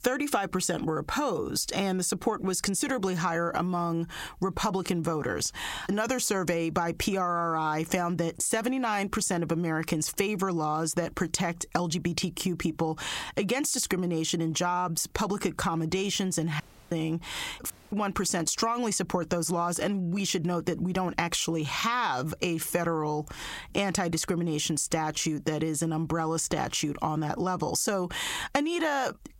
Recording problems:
squashed, flat; heavily
audio cutting out; at 17 s and at 18 s

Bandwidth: 16 kHz